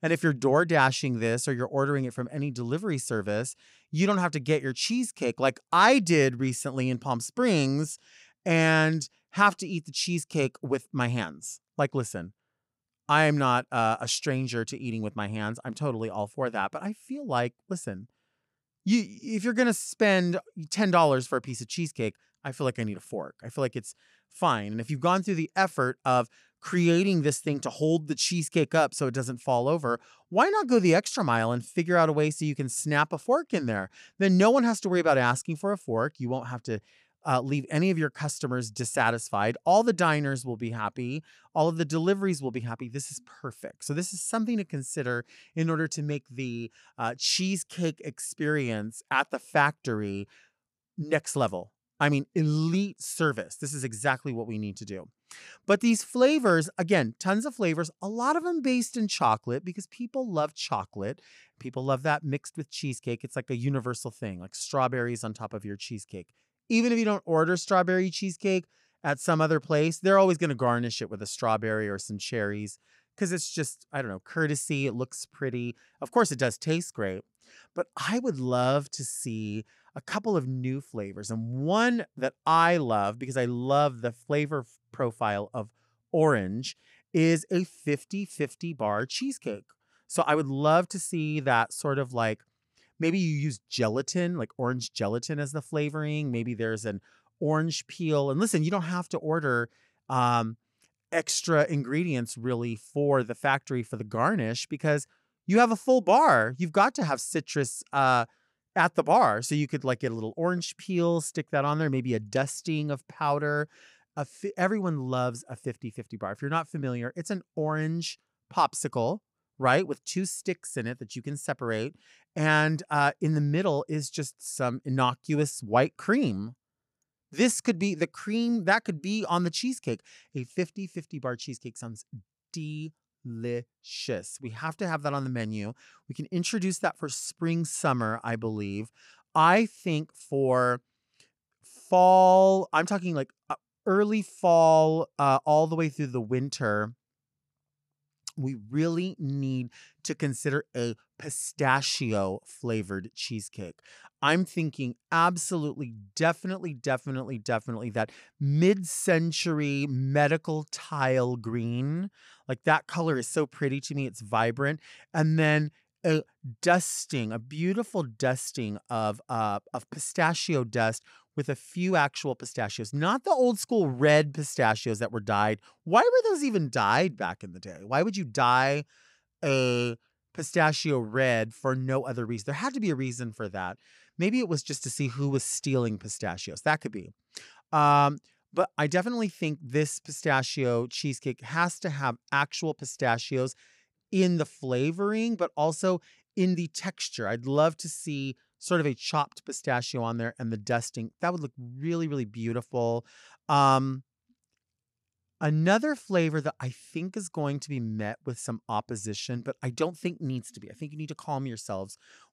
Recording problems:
none

